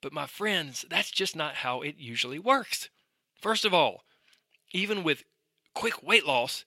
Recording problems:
thin; somewhat; fading below 750 Hz

